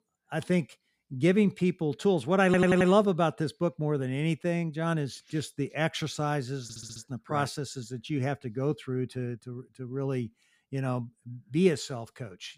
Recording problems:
audio stuttering; at 2.5 s and at 6.5 s

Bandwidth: 15.5 kHz